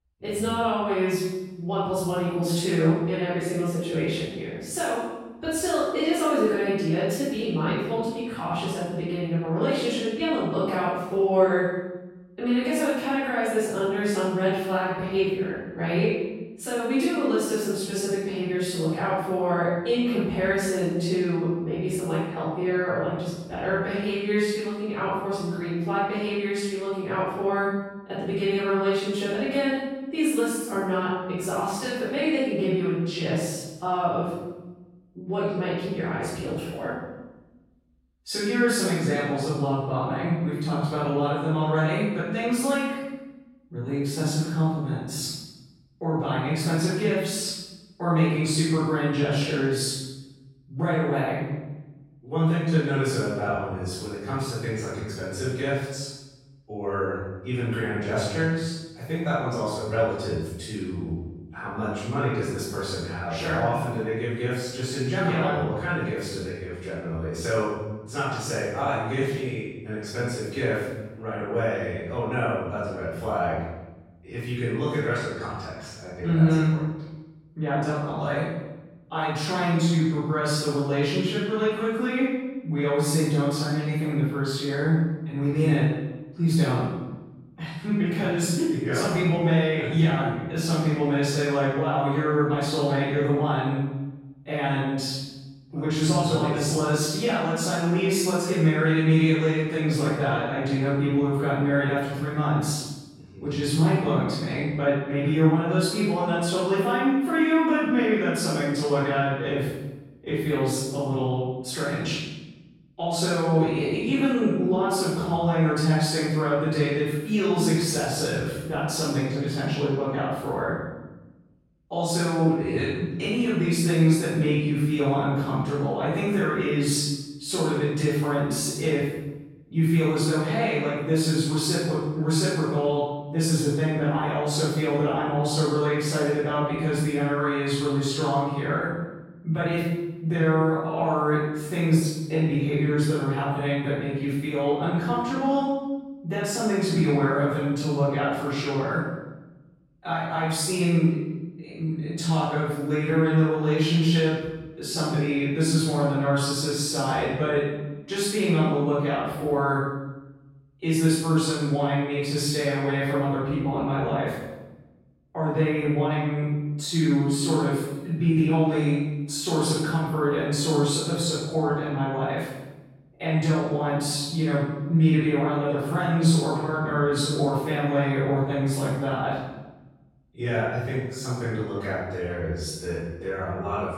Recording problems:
room echo; strong; dies away in 1 s
off-mic speech; far

